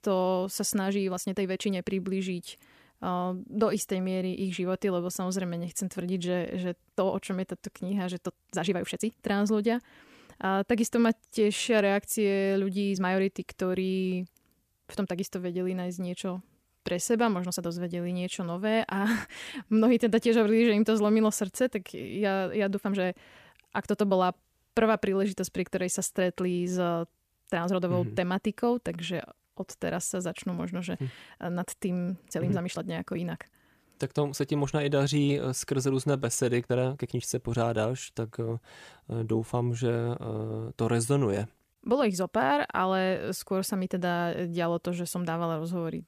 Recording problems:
uneven, jittery; strongly; from 1 to 37 s

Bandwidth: 14.5 kHz